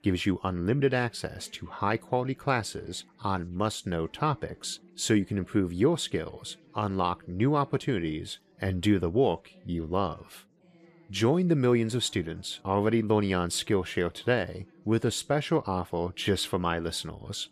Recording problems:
background chatter; faint; throughout; 4 voices, 30 dB below the speech

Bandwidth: 14.5 kHz